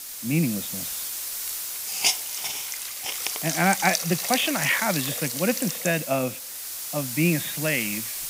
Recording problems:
high frequencies cut off; severe; nothing above 4 kHz
hiss; loud; throughout; 2 dB below the speech

